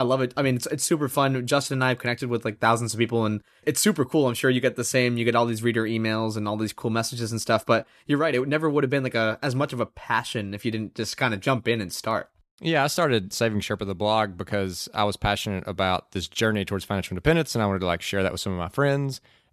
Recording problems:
abrupt cut into speech; at the start

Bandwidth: 13.5 kHz